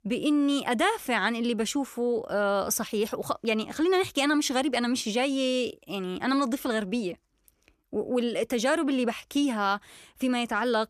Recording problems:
none

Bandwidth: 14 kHz